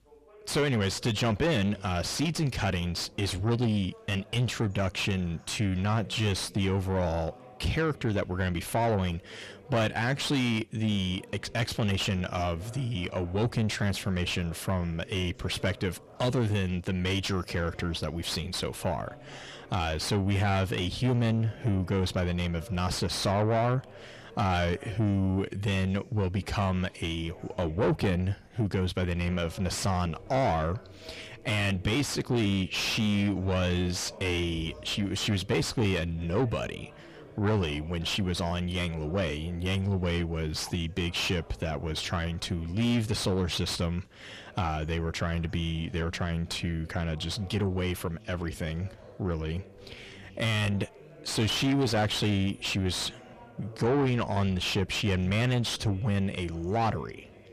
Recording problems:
distortion; heavy; 7 dB below the speech
background chatter; faint; throughout; 2 voices, 20 dB below the speech

